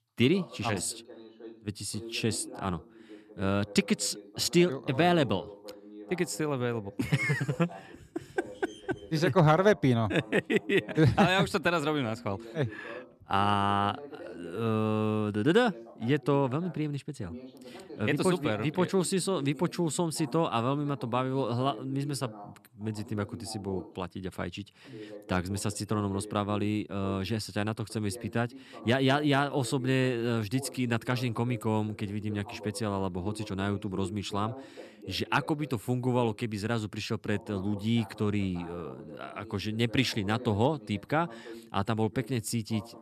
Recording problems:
voice in the background; noticeable; throughout; 15 dB below the speech

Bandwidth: 13.5 kHz